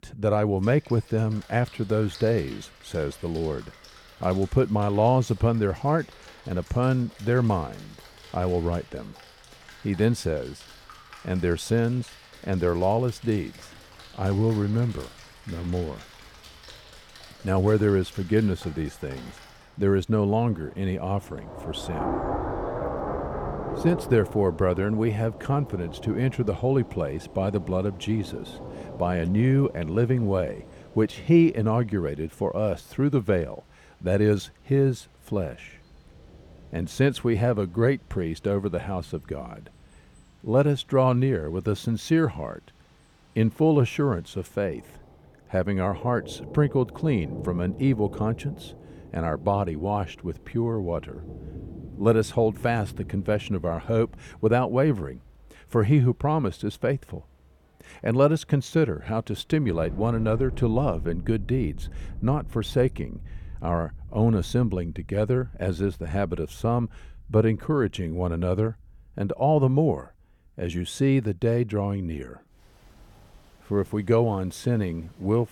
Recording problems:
rain or running water; noticeable; throughout; 15 dB below the speech

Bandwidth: 18 kHz